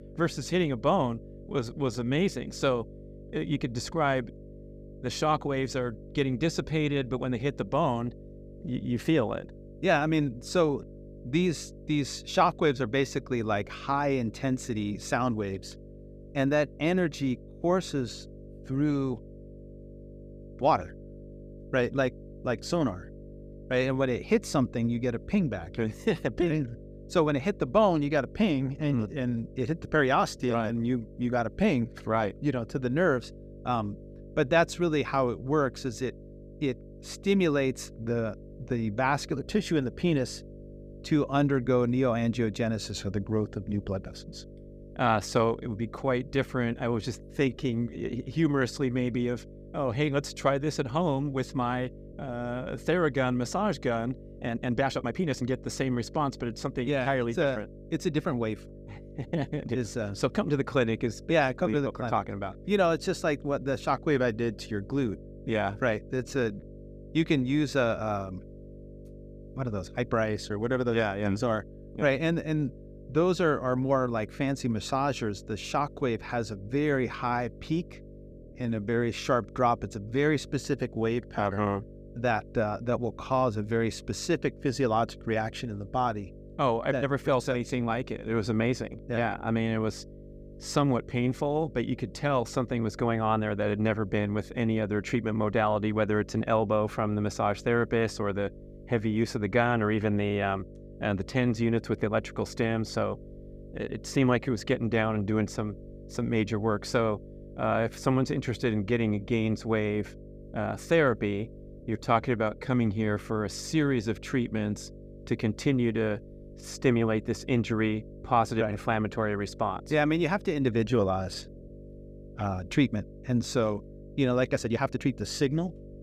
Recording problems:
electrical hum; faint; throughout; 50 Hz, 20 dB below the speech
uneven, jittery; strongly; from 1.5 s to 2:05

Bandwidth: 15 kHz